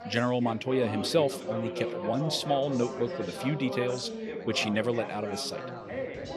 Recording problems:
background chatter; loud; throughout; 3 voices, 6 dB below the speech

